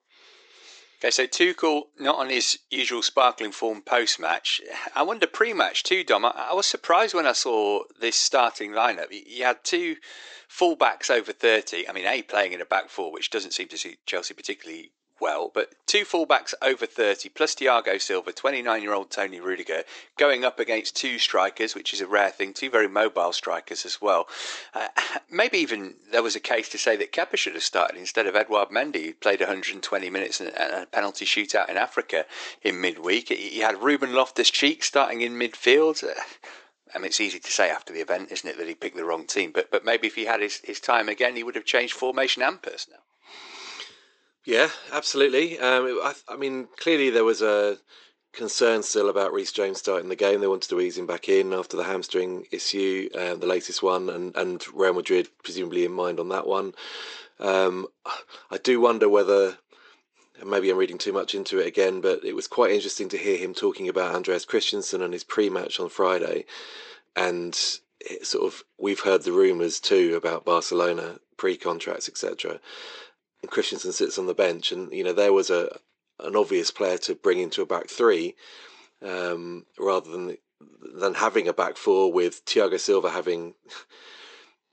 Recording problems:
thin; somewhat; fading below 350 Hz
high frequencies cut off; noticeable; nothing above 8 kHz

